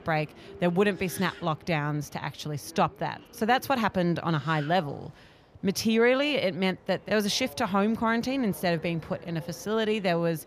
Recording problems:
train or aircraft noise; faint; throughout; 20 dB below the speech

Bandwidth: 15 kHz